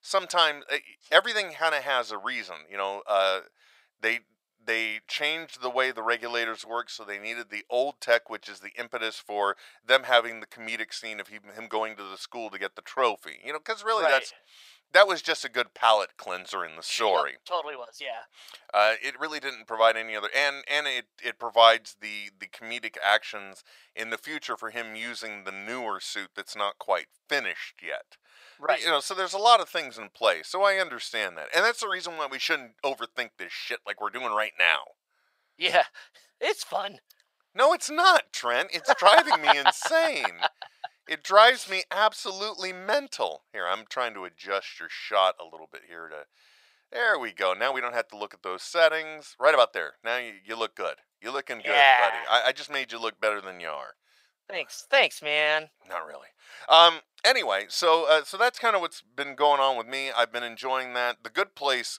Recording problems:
thin; very; fading below 800 Hz

